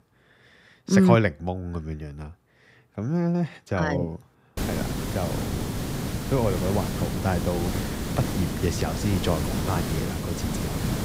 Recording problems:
hiss; loud; from 4.5 s on; 3 dB below the speech

